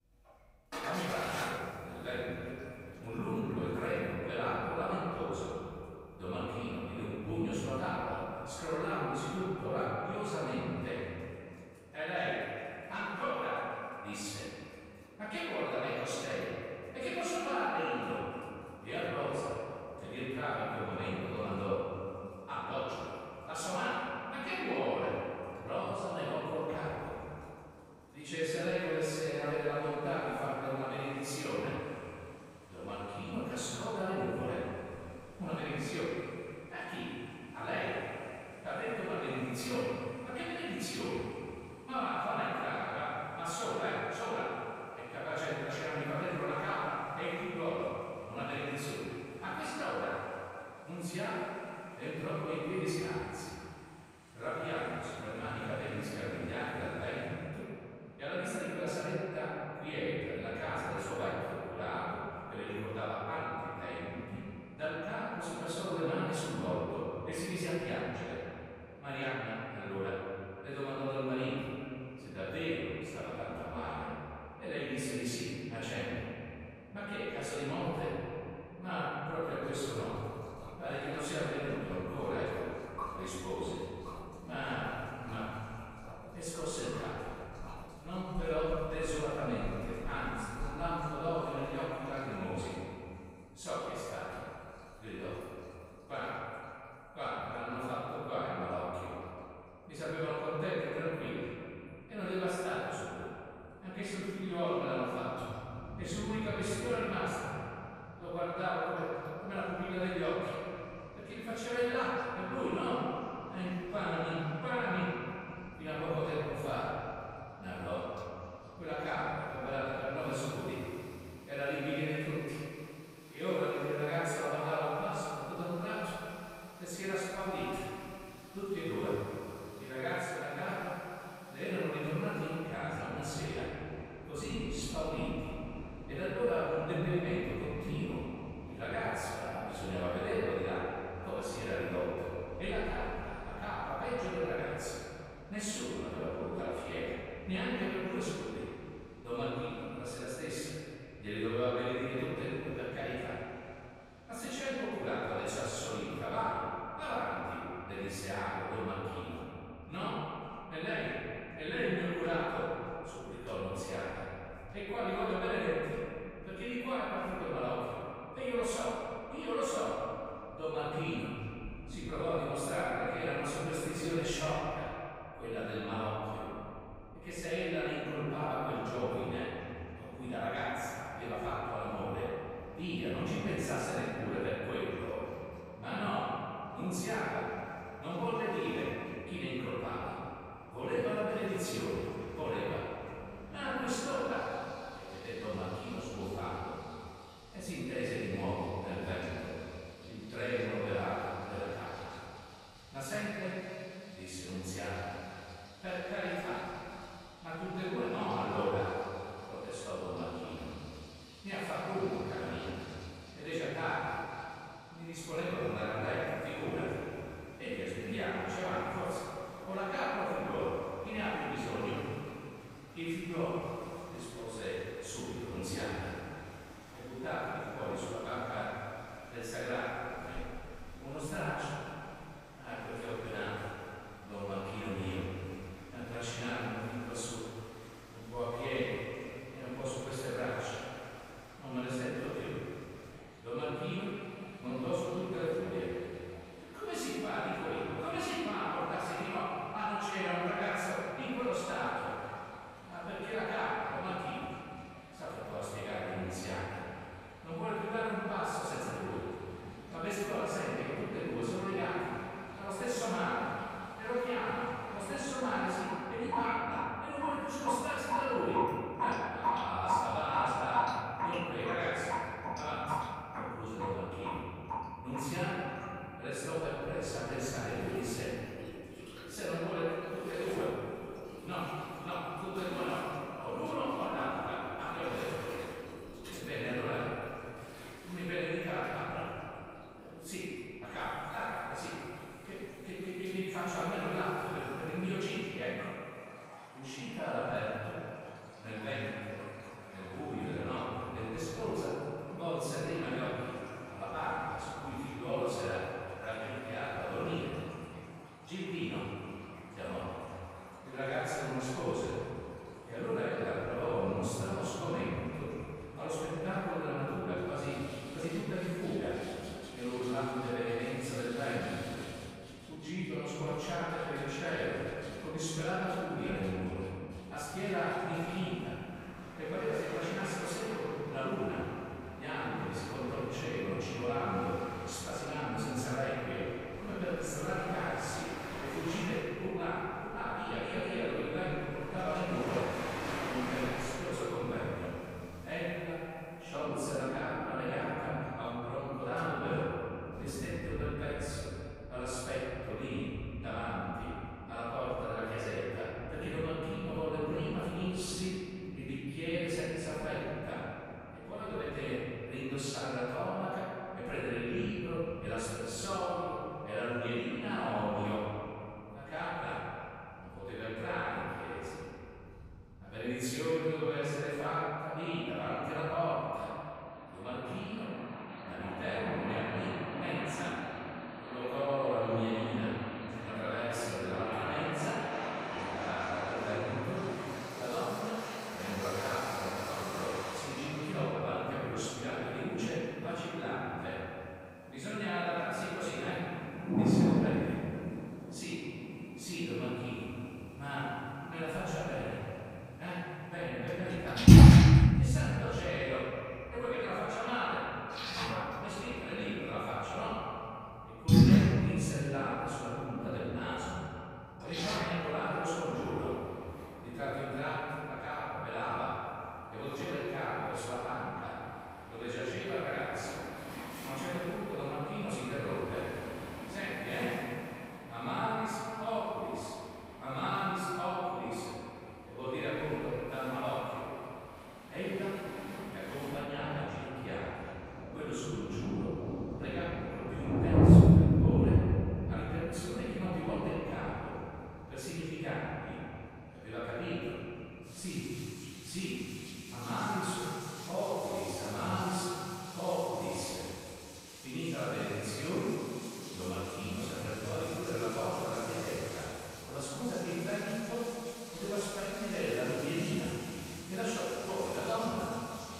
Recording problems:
room echo; strong; dies away in 2.5 s
off-mic speech; far
echo of what is said; noticeable; throughout; 250 ms later, 15 dB below the speech
rain or running water; very loud; throughout; 3 dB above the speech

